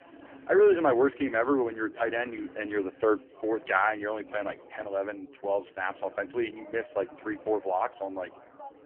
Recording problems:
phone-call audio; poor line
background chatter; faint; throughout; 4 voices, 20 dB below the speech

